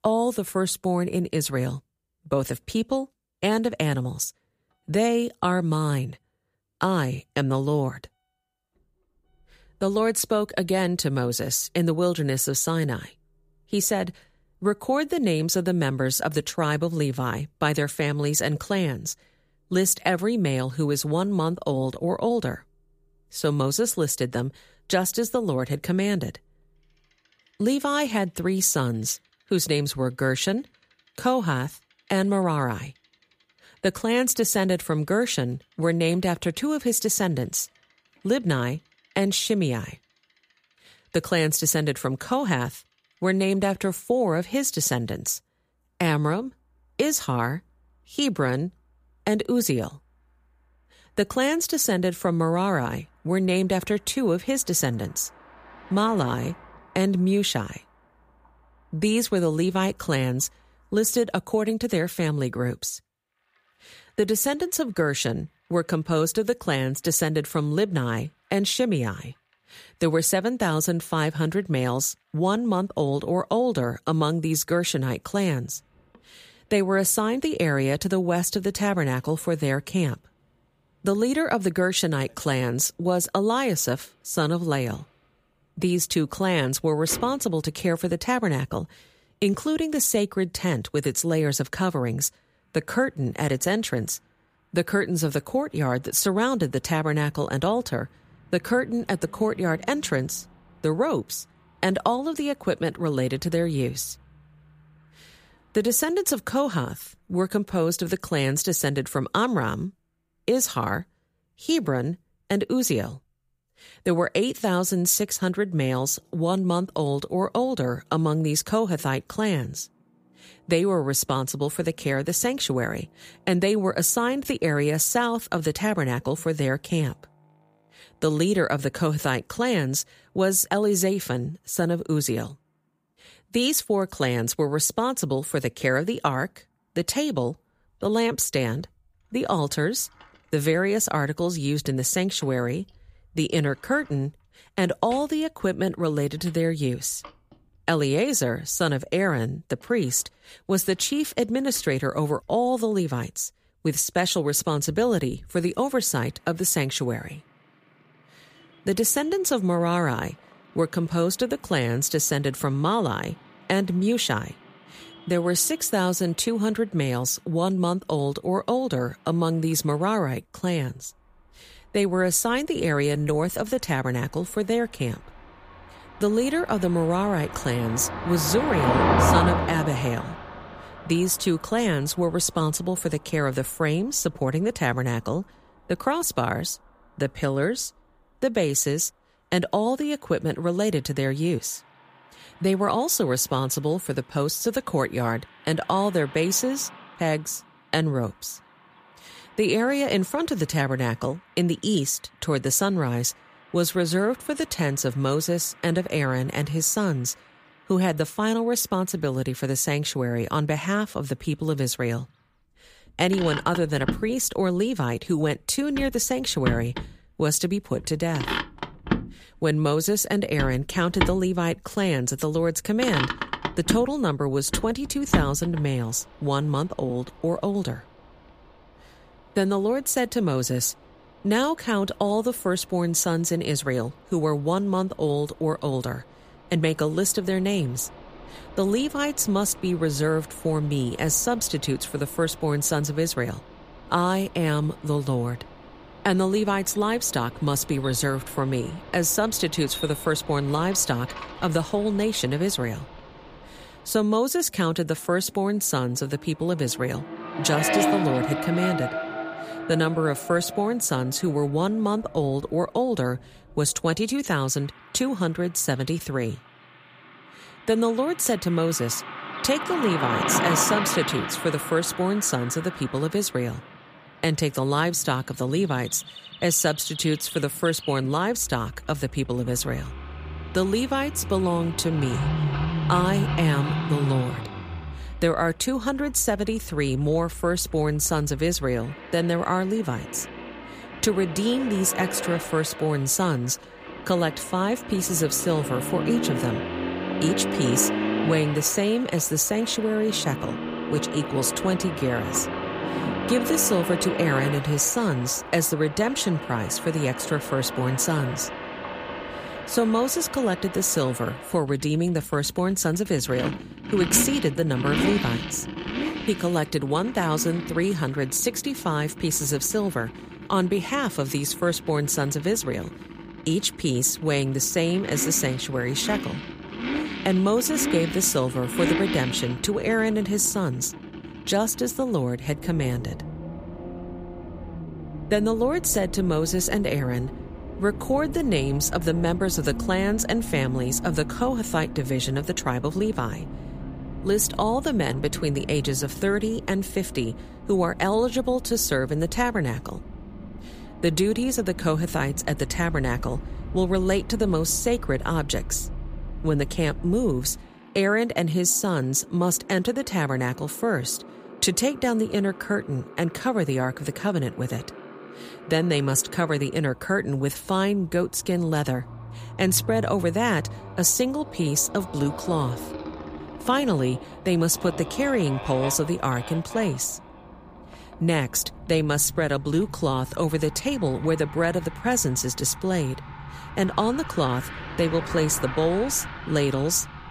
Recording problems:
traffic noise; loud; throughout; 9 dB below the speech

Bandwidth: 15 kHz